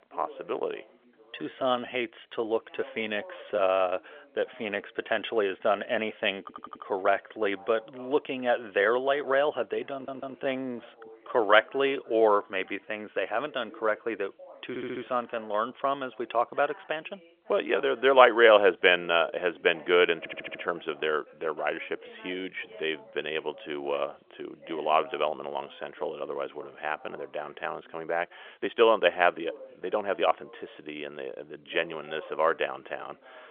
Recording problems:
phone-call audio; nothing above 3.5 kHz
background chatter; faint; throughout; 2 voices, 25 dB below the speech
uneven, jittery; strongly; from 1.5 to 30 s
audio stuttering; 4 times, first at 6.5 s

